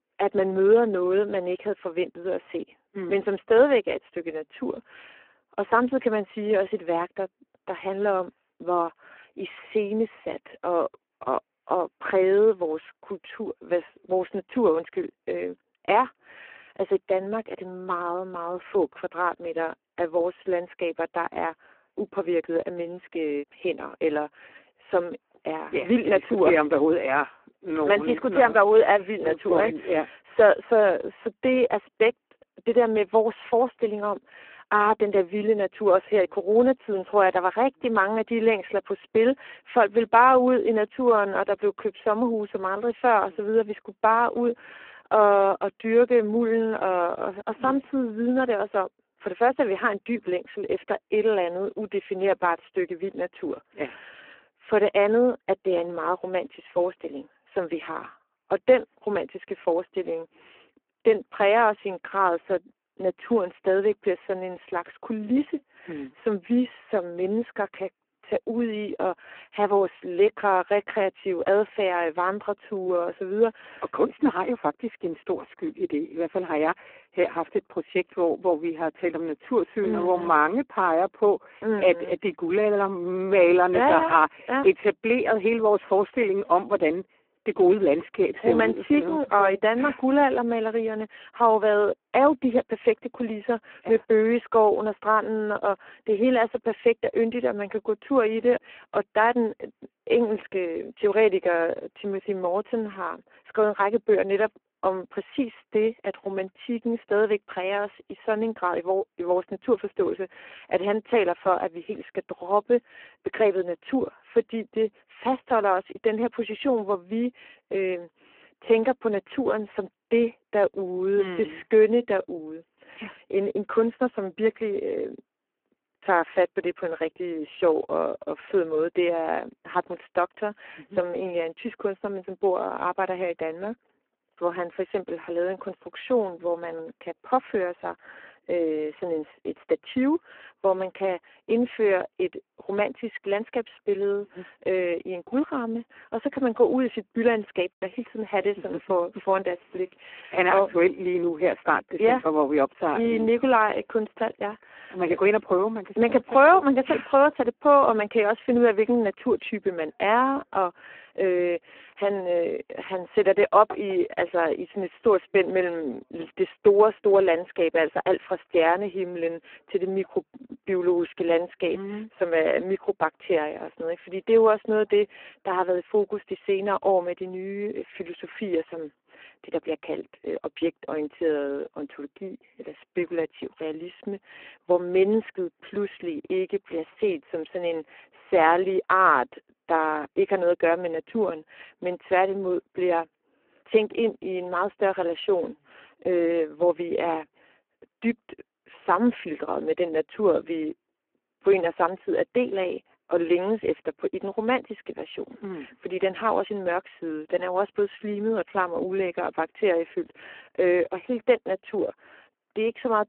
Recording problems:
phone-call audio; poor line

